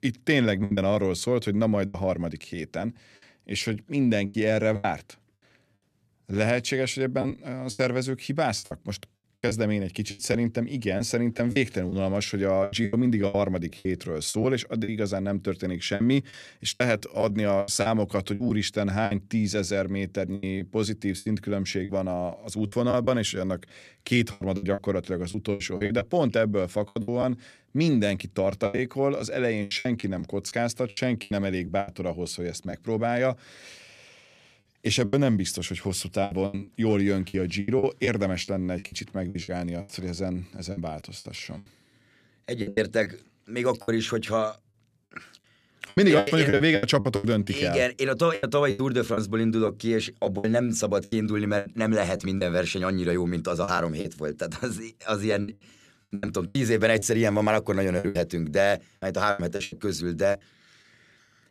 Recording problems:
choppy; very; 12% of the speech affected

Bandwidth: 14.5 kHz